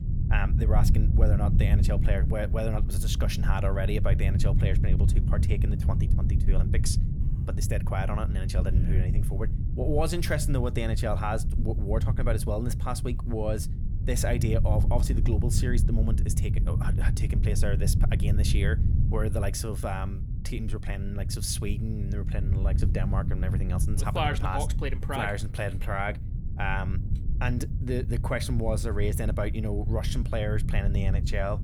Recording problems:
low rumble; loud; throughout; 8 dB below the speech

